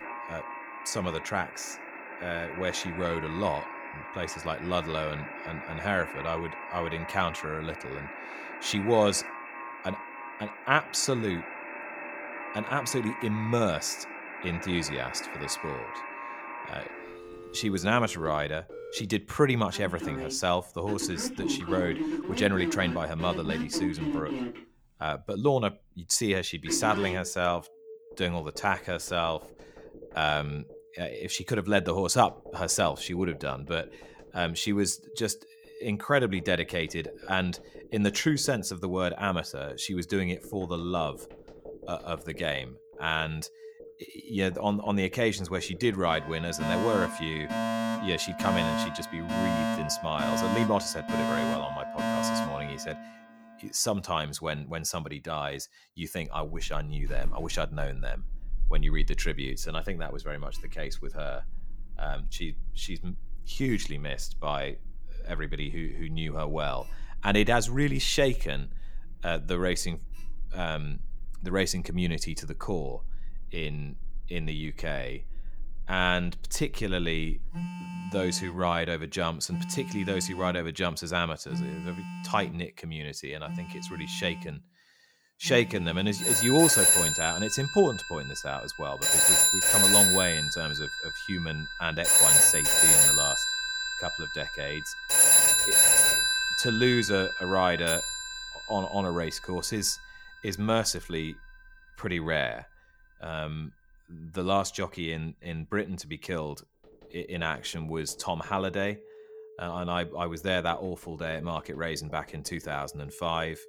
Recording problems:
alarms or sirens; very loud; throughout; 4 dB above the speech

